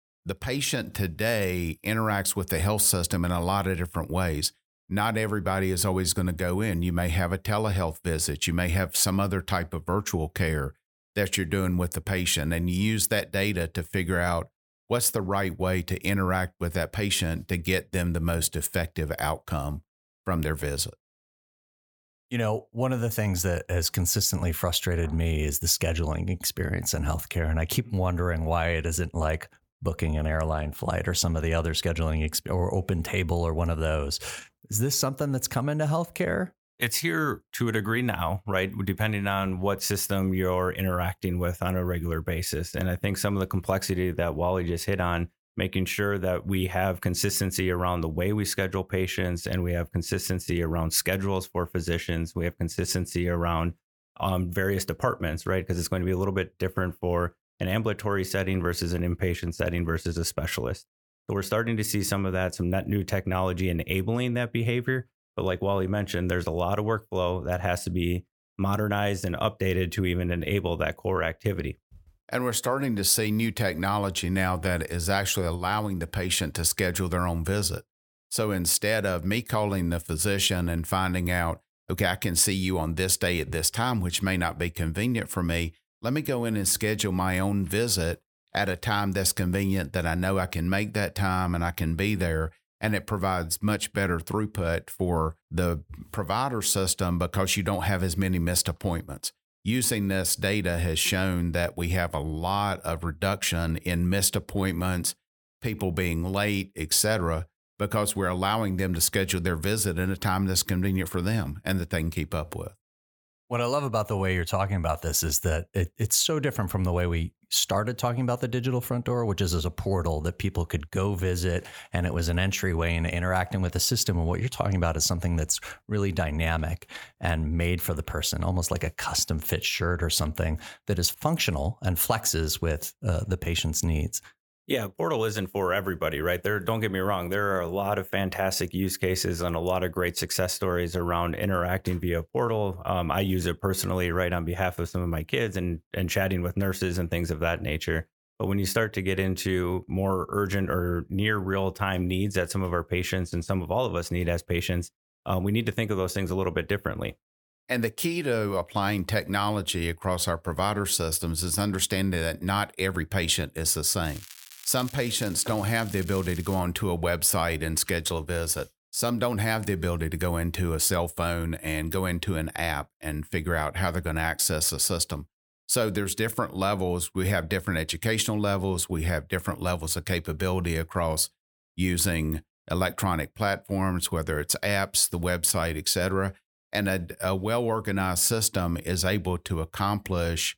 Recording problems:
crackling; noticeable; from 2:44 to 2:47; 15 dB below the speech

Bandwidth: 18 kHz